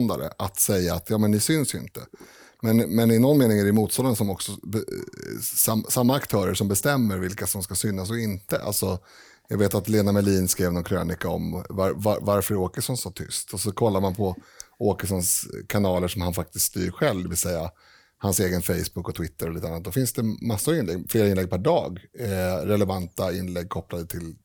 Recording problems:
abrupt cut into speech; at the start

